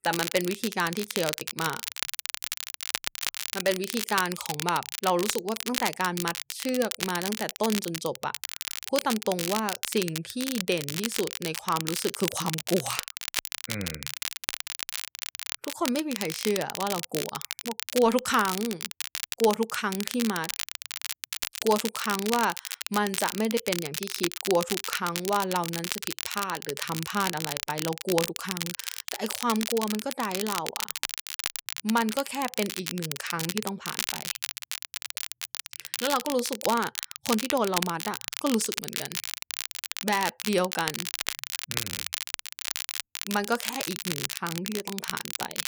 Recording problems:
crackle, like an old record; loud; 3 dB below the speech

